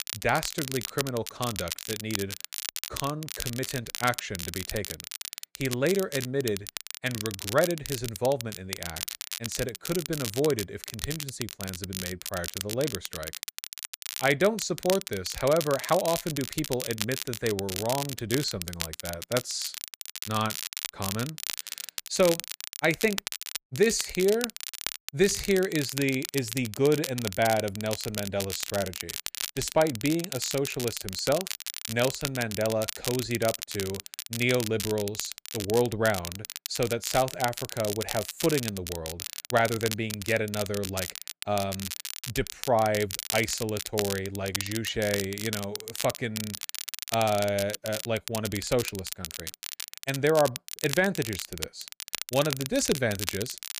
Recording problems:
crackle, like an old record; loud; 6 dB below the speech

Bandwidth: 15 kHz